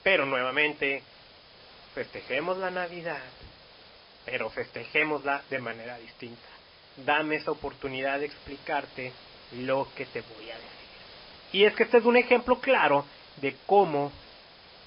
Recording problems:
garbled, watery; badly; nothing above 5 kHz
hiss; faint; throughout; 20 dB below the speech

